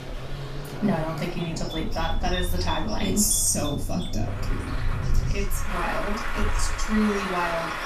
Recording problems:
off-mic speech; far
room echo; slight; dies away in 0.3 s
traffic noise; loud; throughout; 5 dB below the speech
electrical hum; noticeable; throughout; 60 Hz, 20 dB below the speech
animal sounds; noticeable; throughout; 15 dB below the speech

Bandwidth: 14.5 kHz